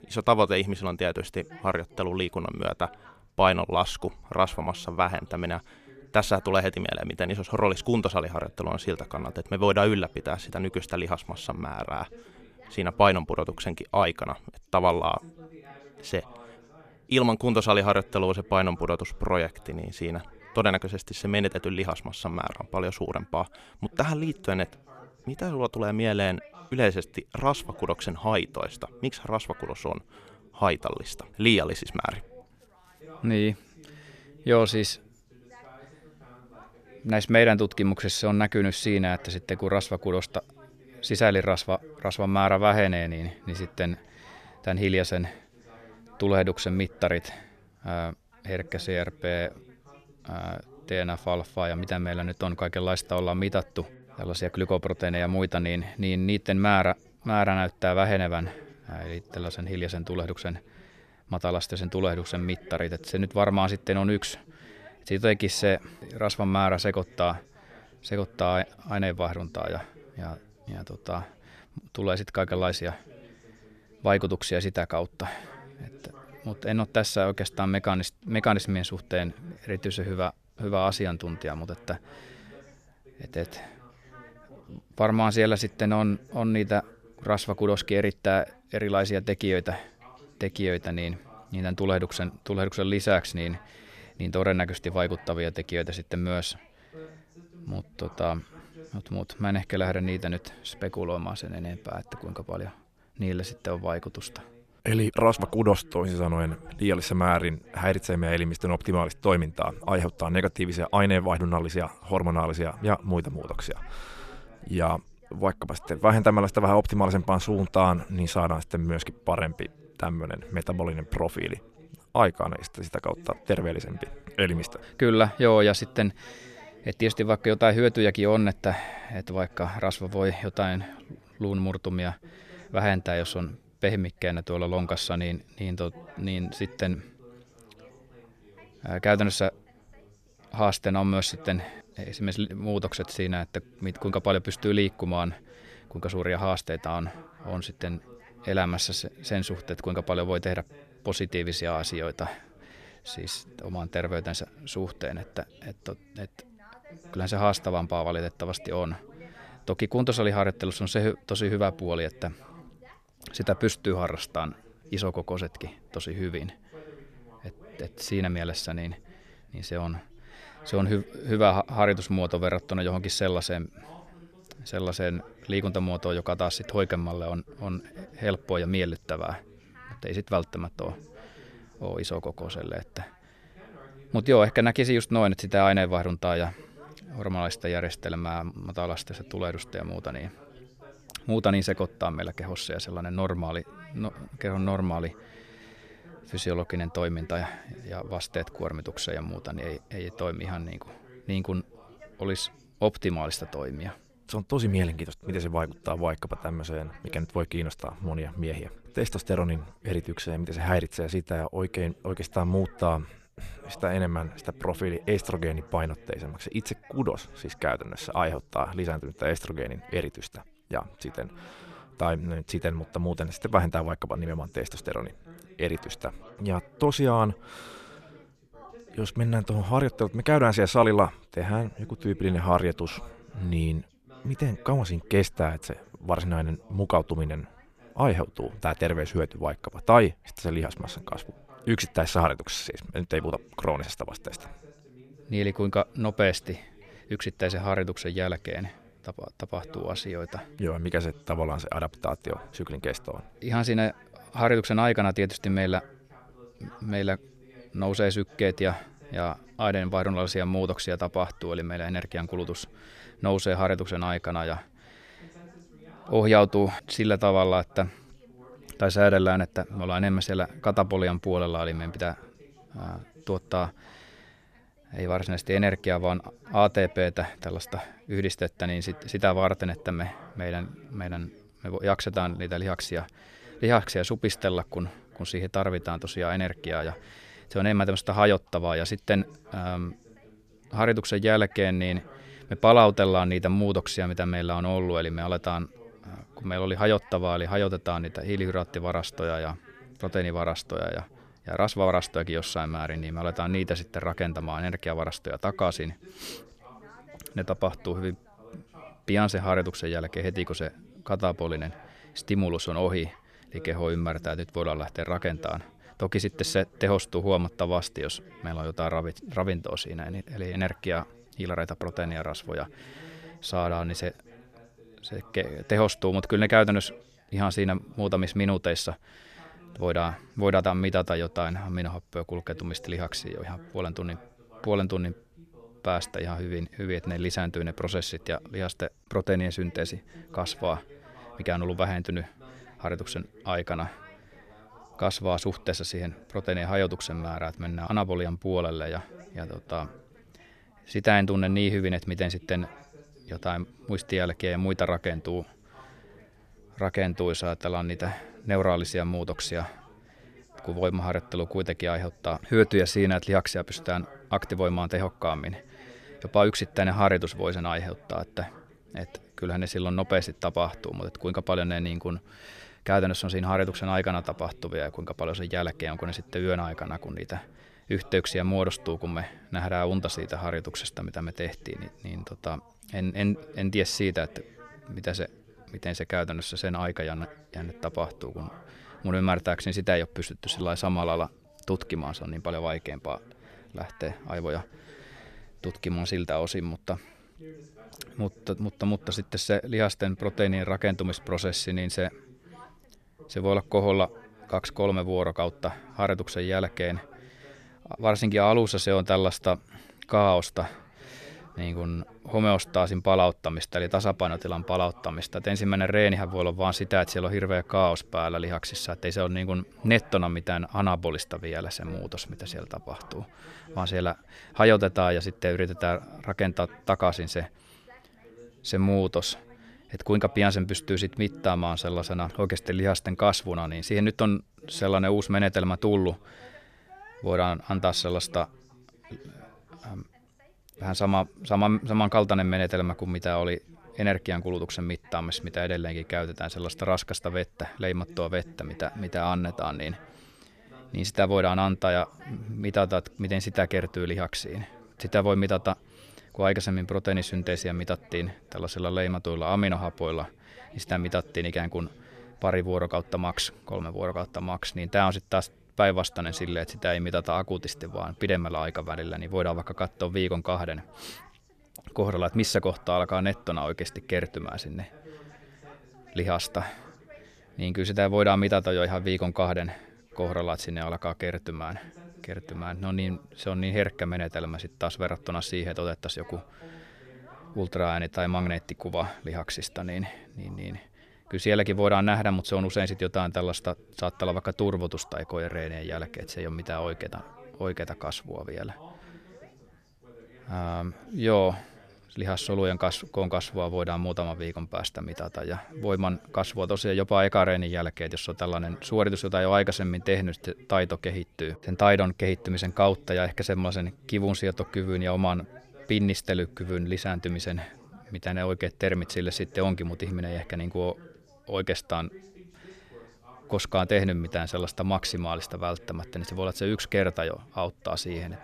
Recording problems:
background chatter; faint; throughout; 2 voices, 25 dB below the speech

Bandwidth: 14.5 kHz